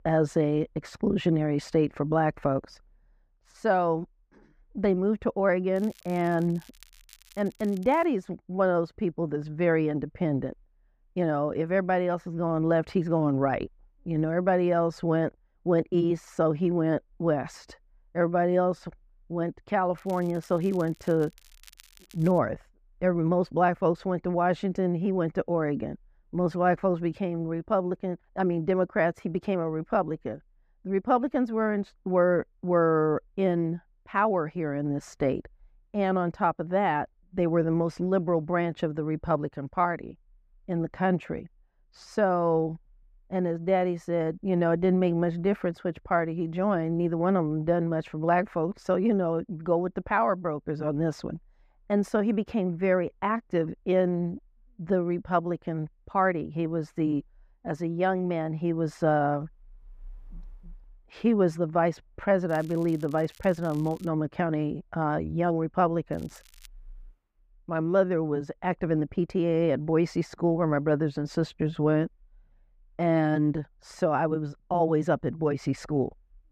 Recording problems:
muffled; very; fading above 3 kHz
crackling; faint; 4 times, first at 6 s; 25 dB below the speech

